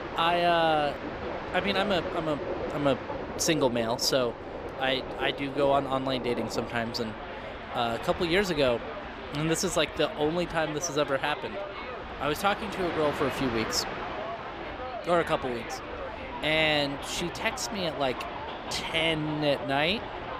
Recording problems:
train or aircraft noise; loud; throughout; 8 dB below the speech

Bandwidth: 15 kHz